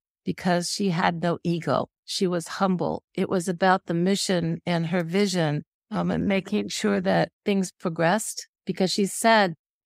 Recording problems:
none

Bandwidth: 15.5 kHz